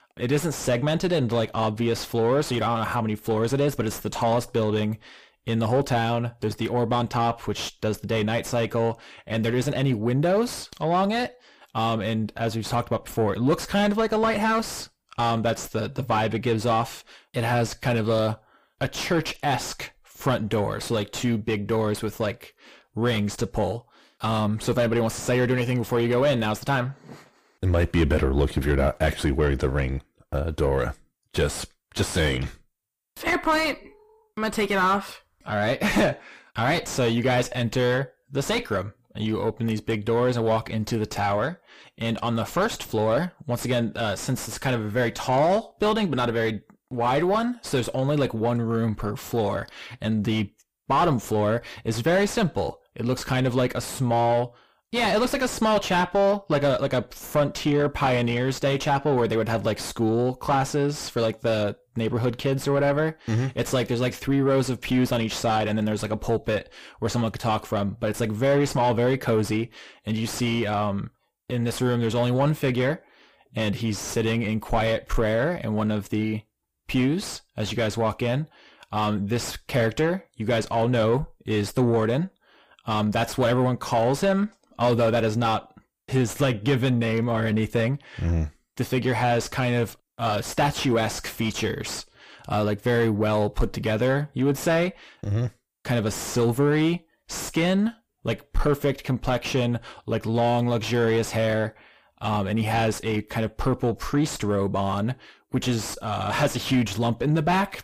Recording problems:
distortion; heavy; 5 dB below the speech

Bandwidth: 15 kHz